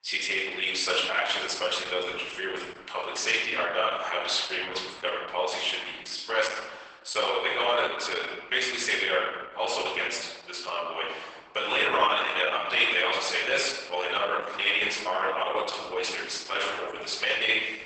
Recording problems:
off-mic speech; far
garbled, watery; badly; nothing above 8 kHz
thin; very; fading below 850 Hz
room echo; noticeable; dies away in 1.2 s

